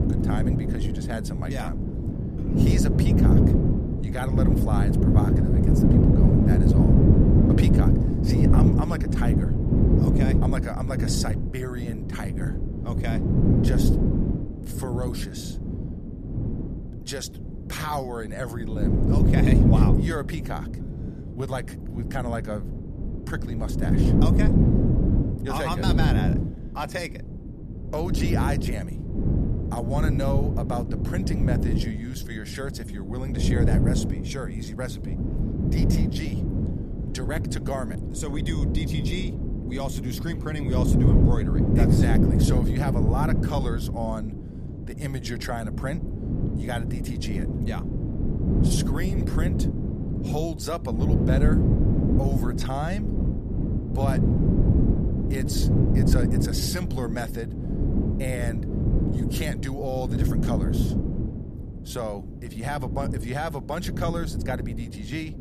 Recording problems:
wind noise on the microphone; heavy; 1 dB above the speech

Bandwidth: 14.5 kHz